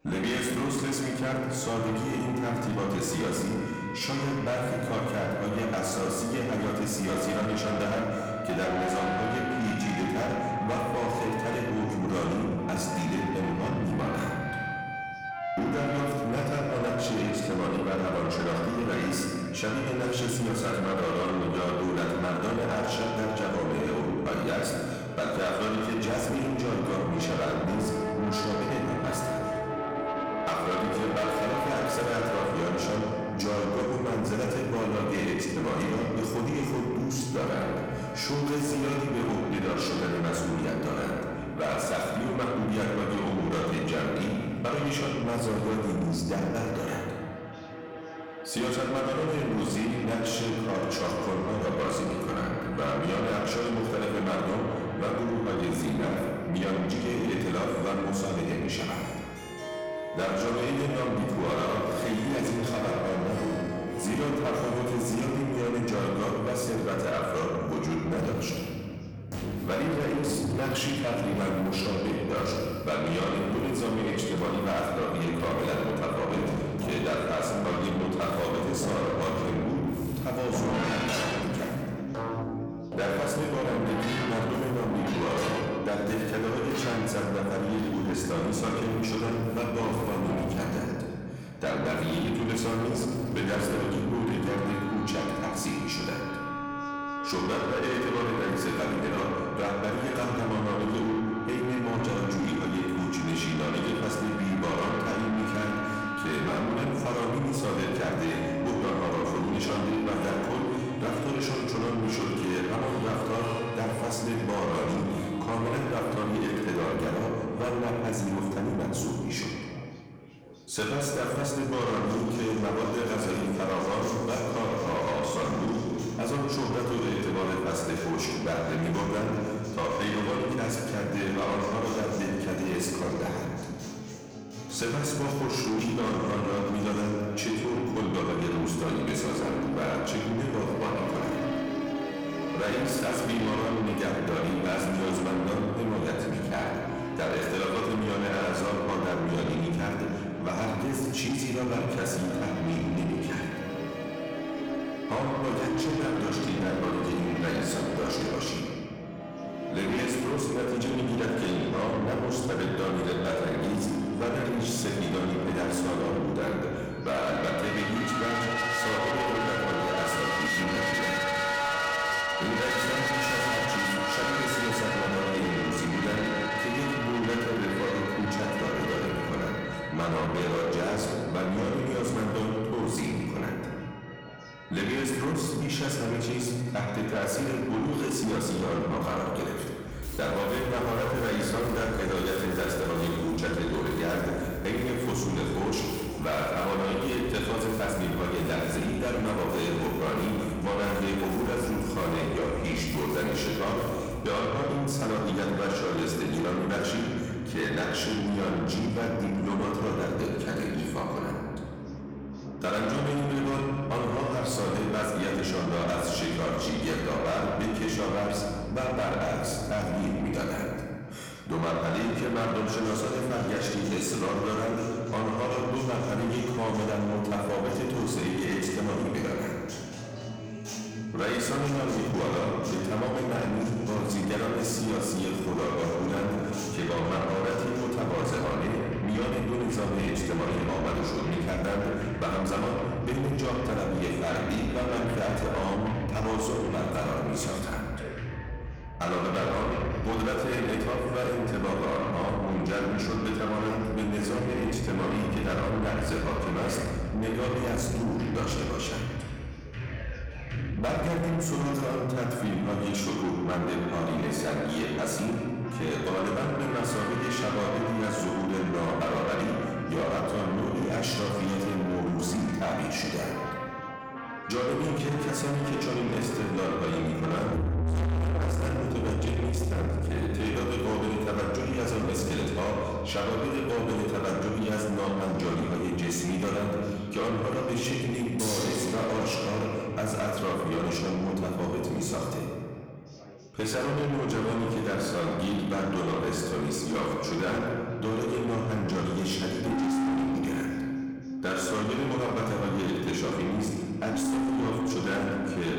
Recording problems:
distortion; heavy; 8 dB below the speech
room echo; noticeable; dies away in 1.6 s
off-mic speech; somewhat distant
chatter from many people; faint; throughout; 25 dB below the speech
background music; very faint; throughout; 6 dB below the speech

